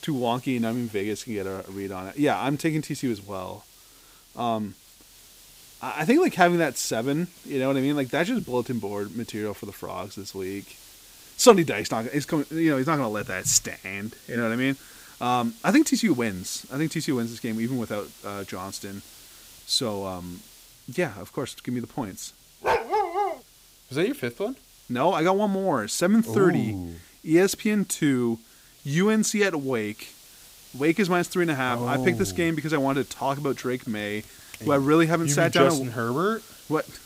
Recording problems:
hiss; faint; throughout; 20 dB below the speech
dog barking; loud; at 23 s; peak 2 dB above the speech

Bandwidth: 15.5 kHz